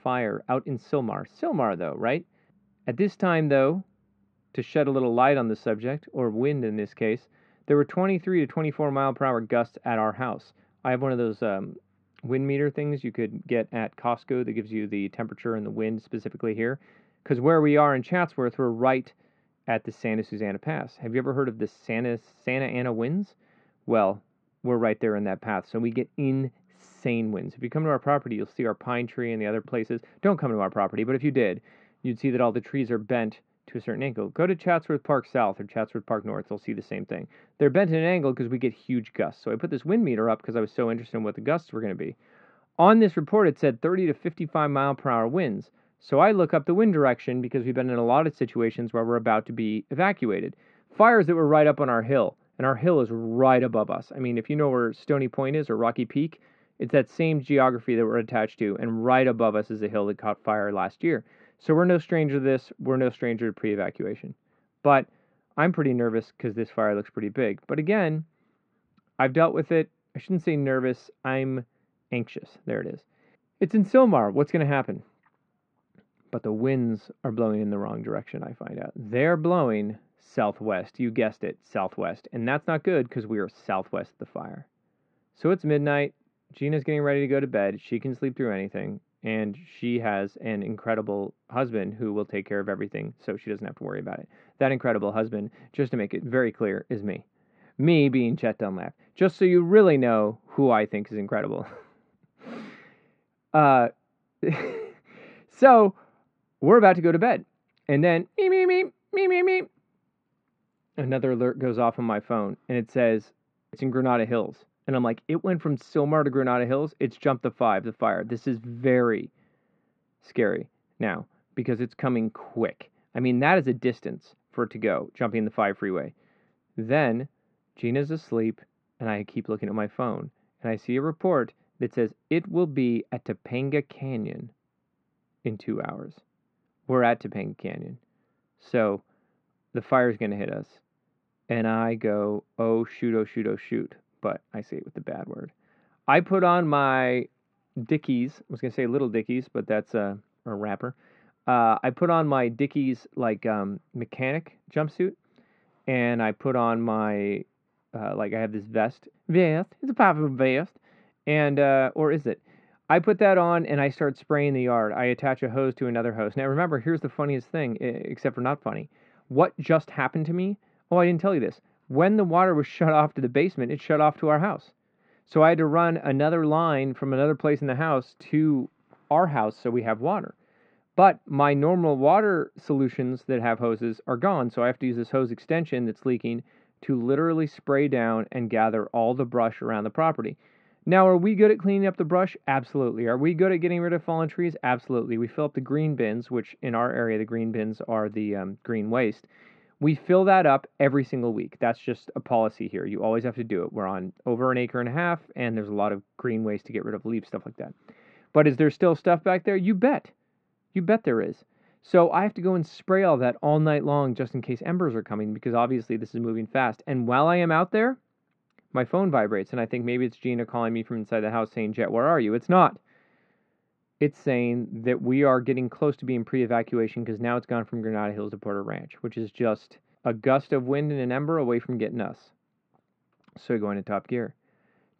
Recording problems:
muffled; very; fading above 2 kHz

